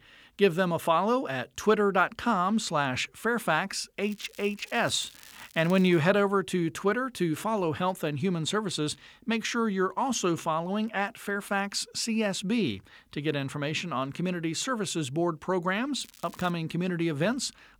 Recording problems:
crackling; faint; from 4 to 6 s and at 16 s; 20 dB below the speech

